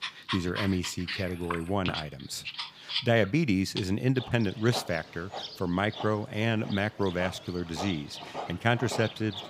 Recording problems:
animal sounds; loud; throughout; 8 dB below the speech

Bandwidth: 15.5 kHz